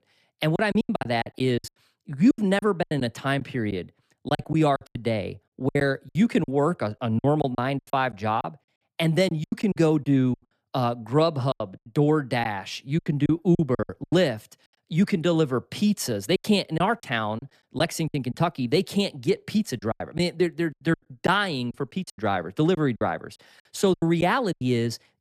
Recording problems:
choppy; very; 13% of the speech affected

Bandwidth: 14.5 kHz